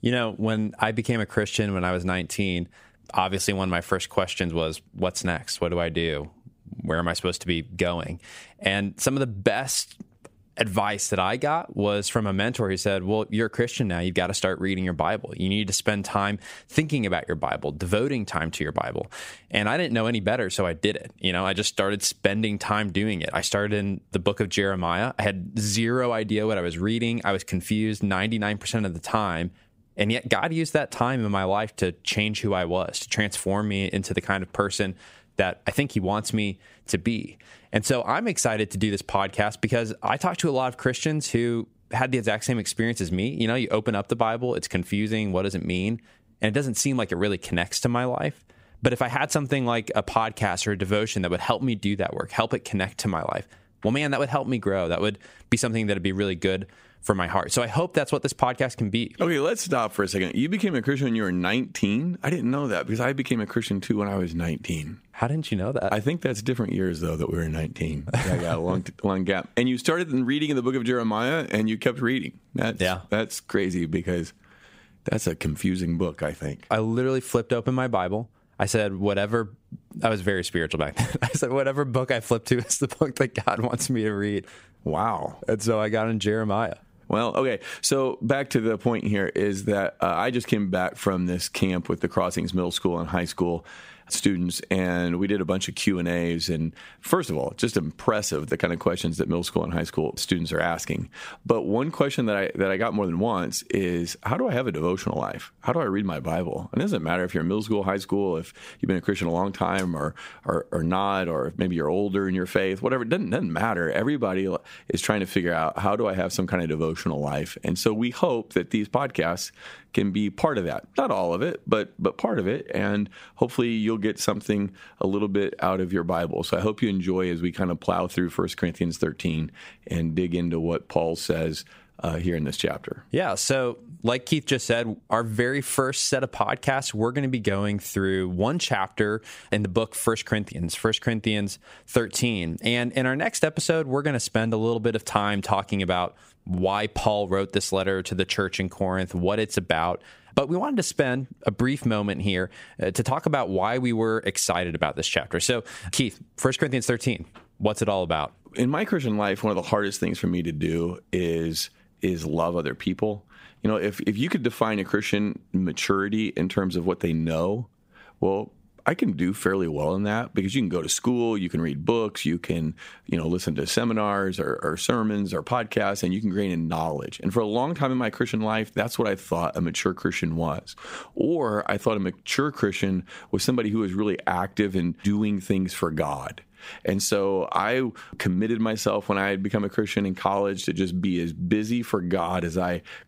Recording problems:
squashed, flat; somewhat

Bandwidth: 15.5 kHz